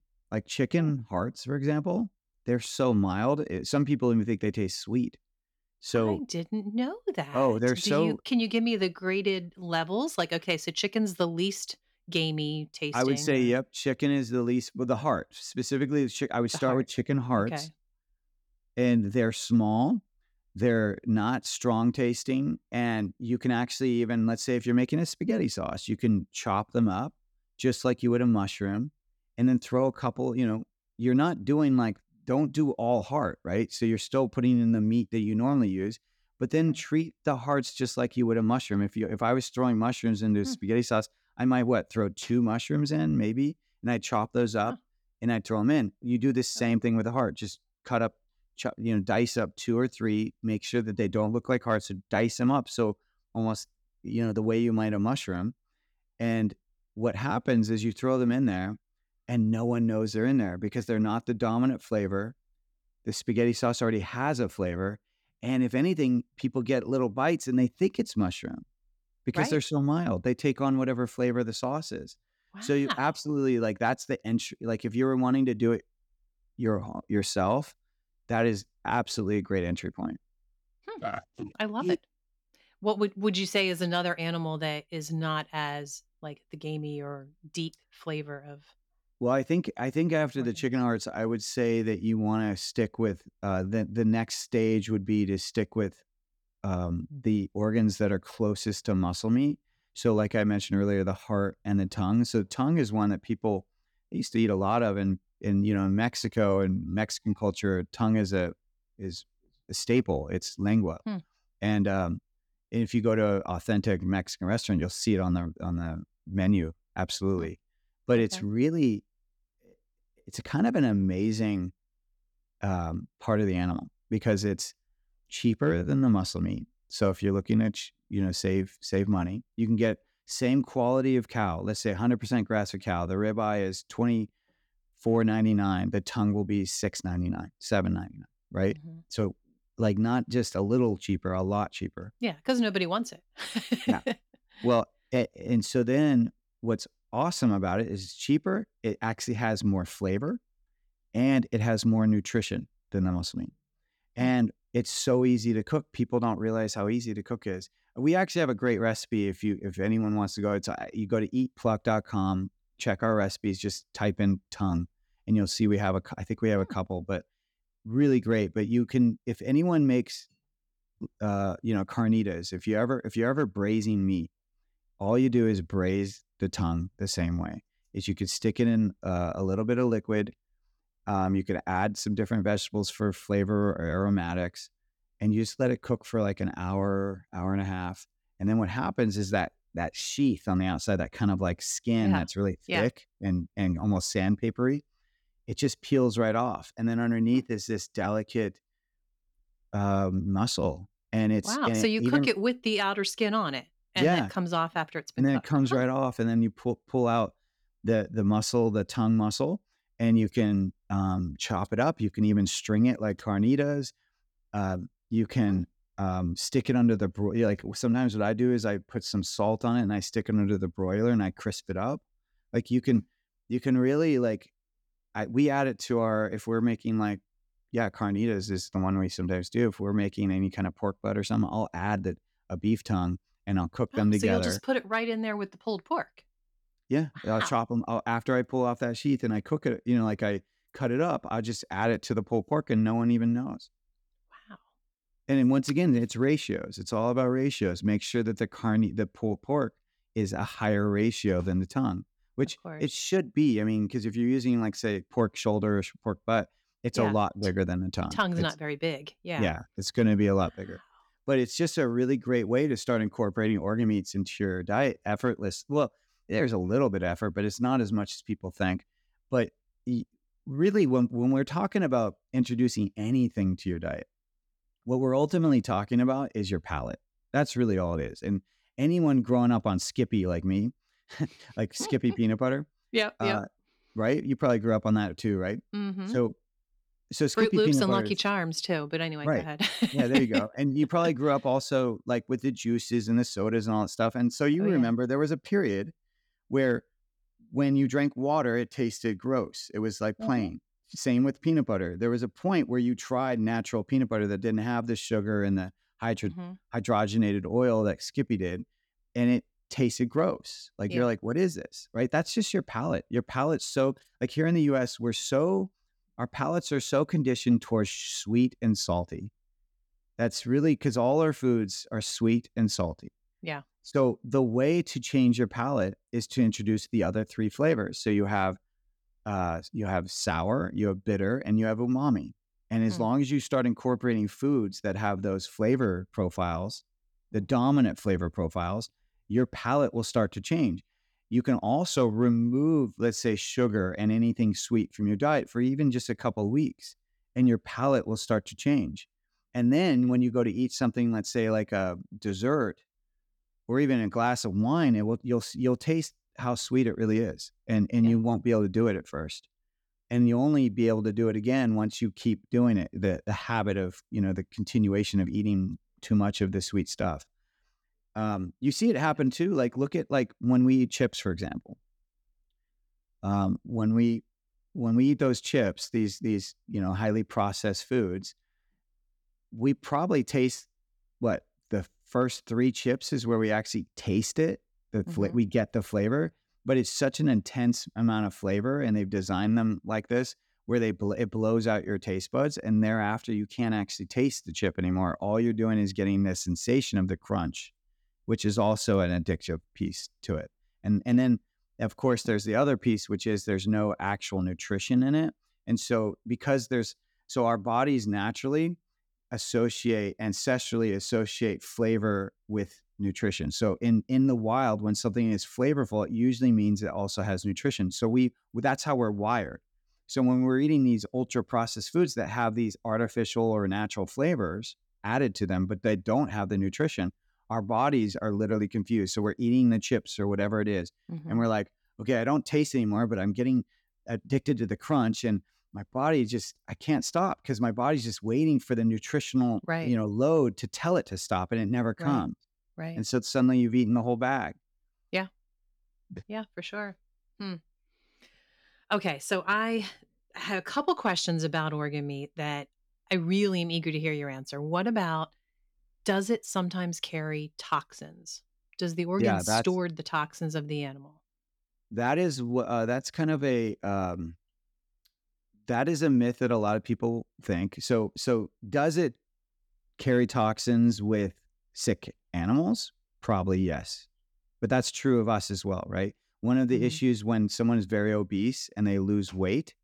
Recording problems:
none

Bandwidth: 18 kHz